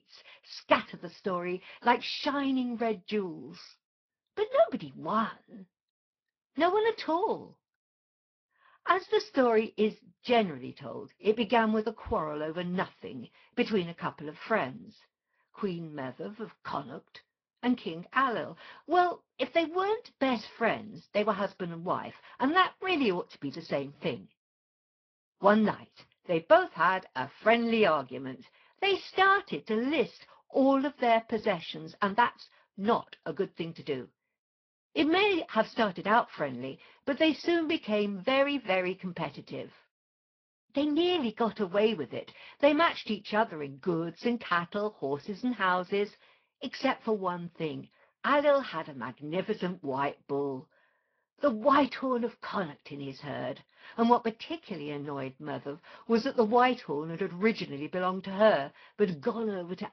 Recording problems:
high frequencies cut off; noticeable; nothing above 5.5 kHz
garbled, watery; slightly

